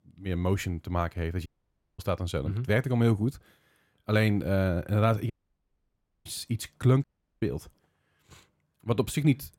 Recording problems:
audio cutting out; at 1.5 s for 0.5 s, at 5.5 s for 1 s and at 7 s

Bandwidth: 16.5 kHz